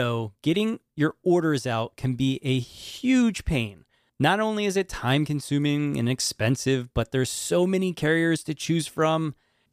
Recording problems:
abrupt cut into speech; at the start

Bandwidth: 15 kHz